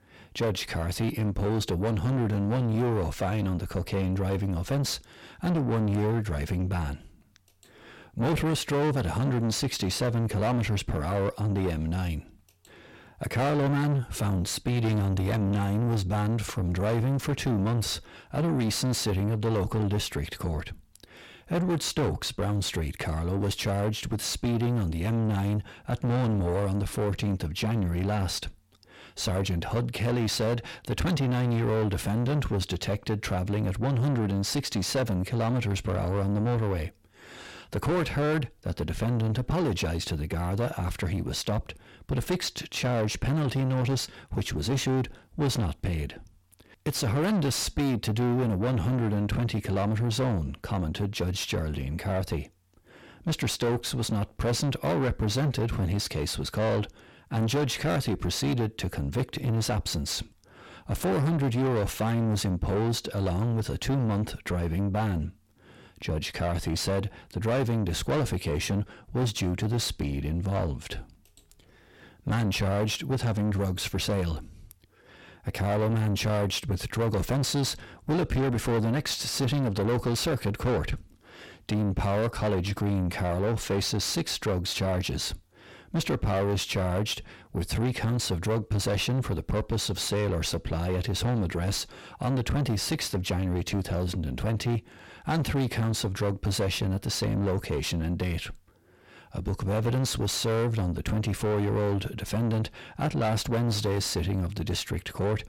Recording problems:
distortion; heavy; 7 dB below the speech

